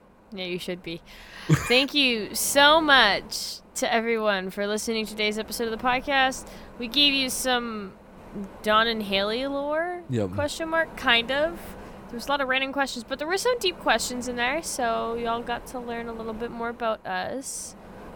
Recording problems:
wind noise on the microphone; occasional gusts; 25 dB below the speech

